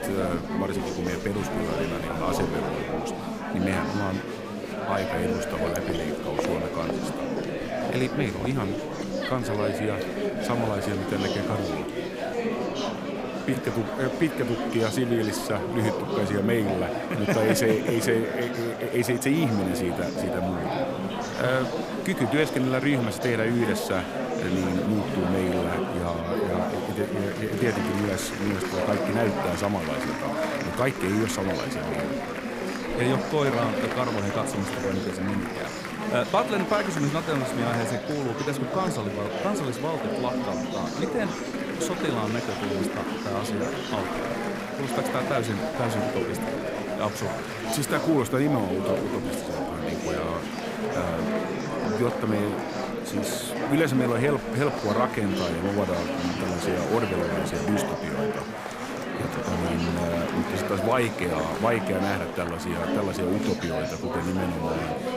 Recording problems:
murmuring crowd; loud; throughout; 1 dB below the speech

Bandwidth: 15.5 kHz